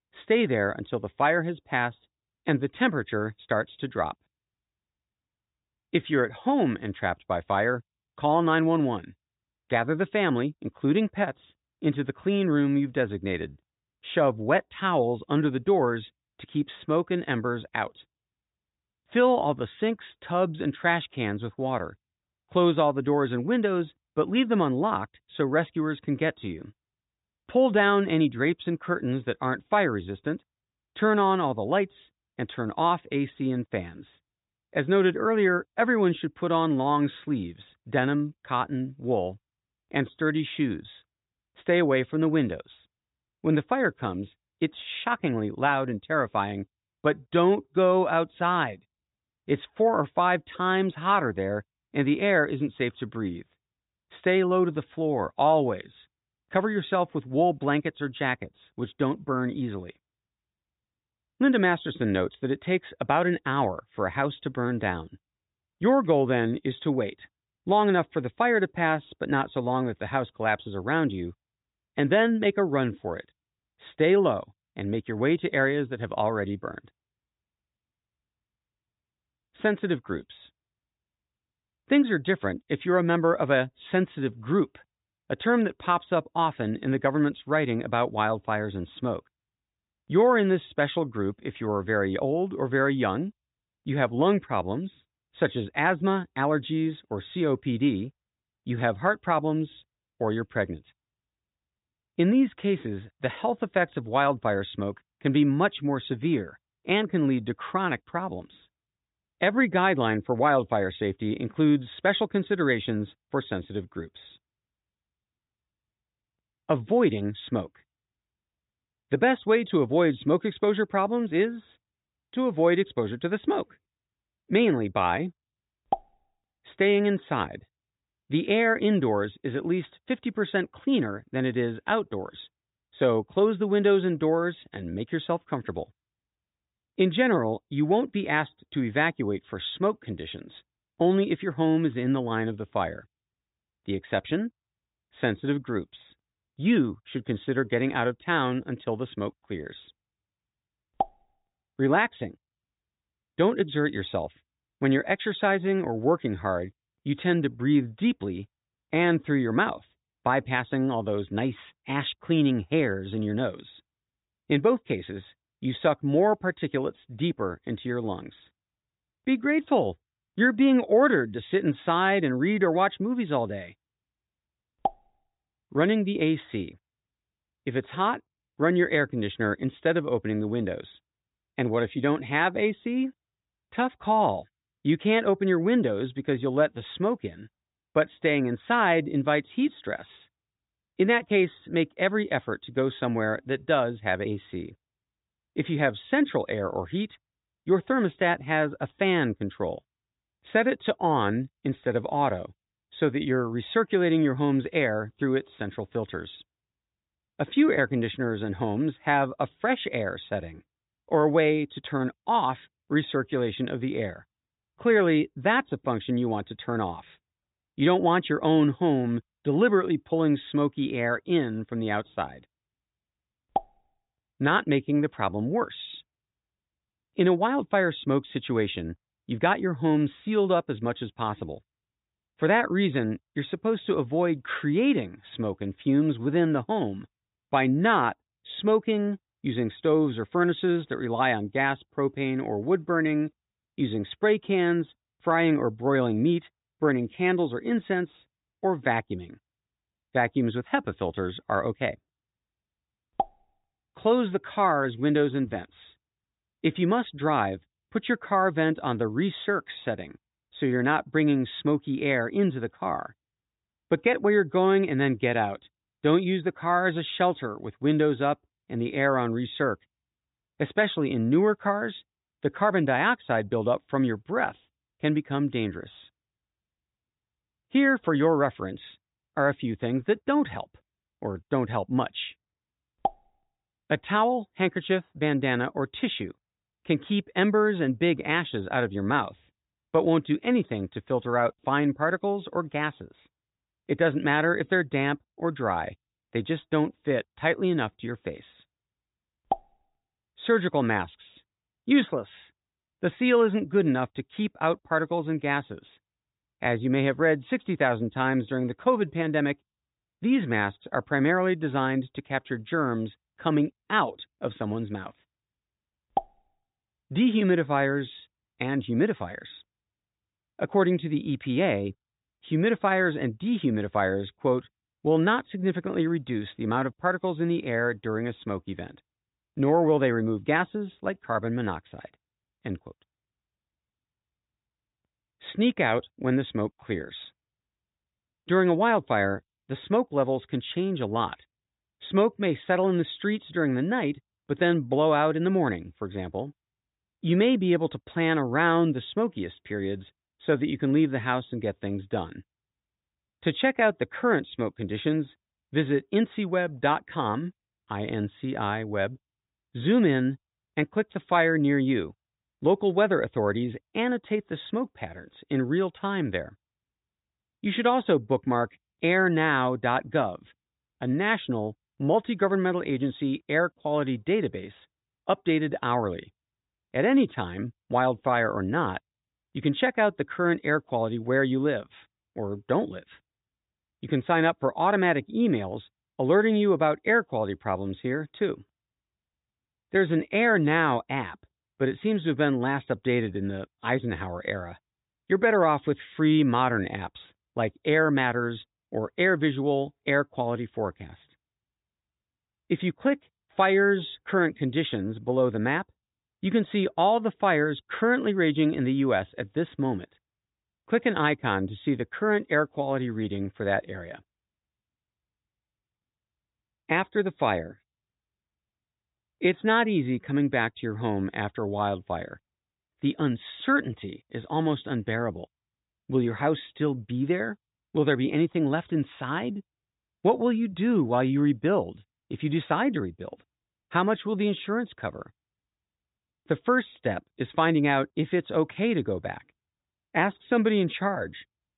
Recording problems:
high frequencies cut off; severe; nothing above 4 kHz

